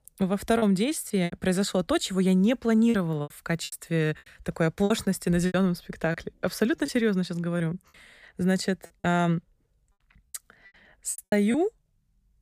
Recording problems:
choppy; very; 10% of the speech affected

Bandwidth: 15 kHz